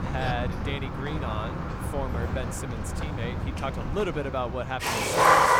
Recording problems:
rain or running water; very loud; throughout; 5 dB above the speech

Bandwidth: 18 kHz